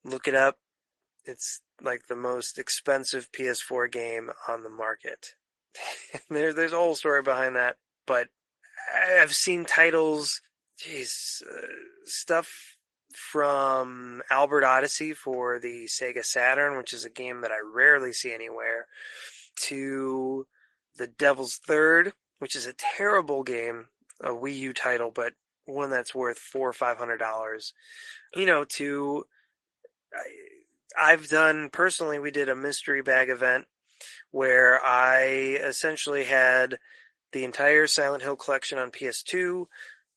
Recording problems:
thin; somewhat; fading below 450 Hz
garbled, watery; slightly; nothing above 11.5 kHz

